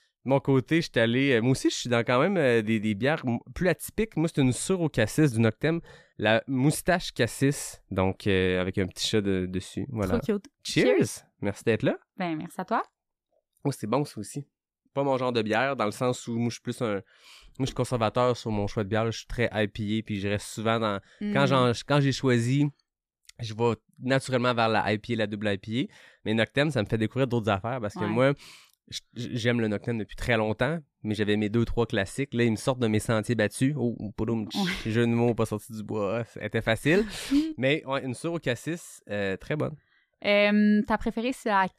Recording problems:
none

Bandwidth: 14.5 kHz